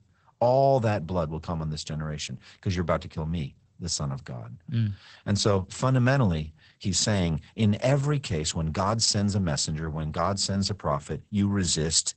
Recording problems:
garbled, watery; badly; nothing above 8 kHz

